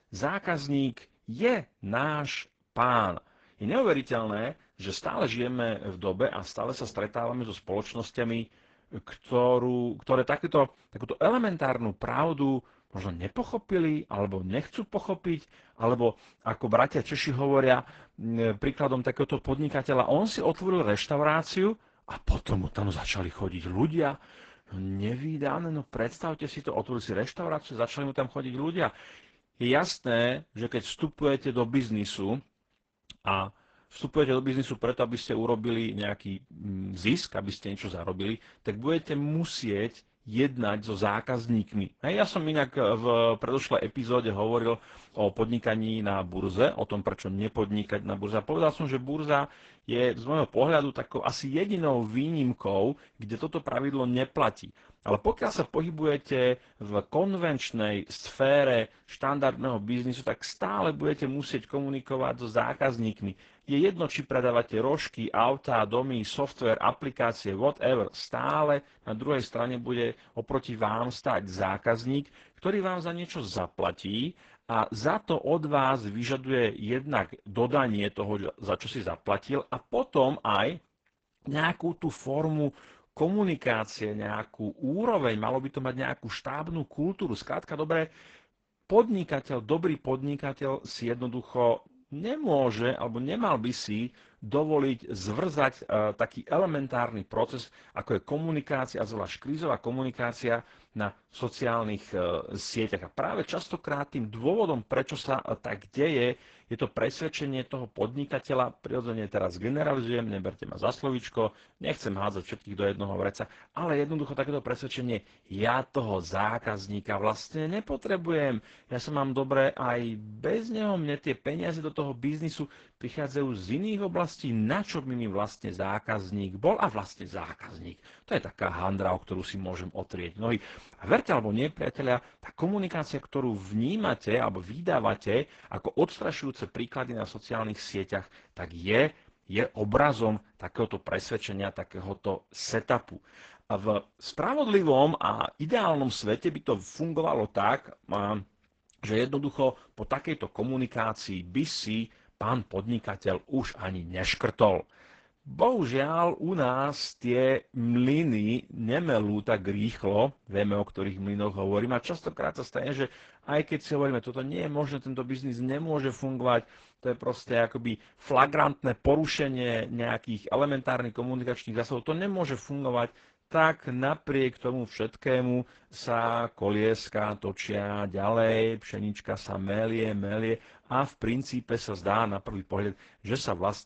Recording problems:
garbled, watery; badly; nothing above 8 kHz

